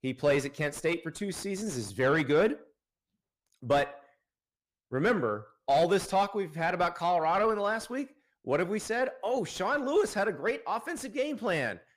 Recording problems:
distortion; slight; 10 dB below the speech

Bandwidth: 15 kHz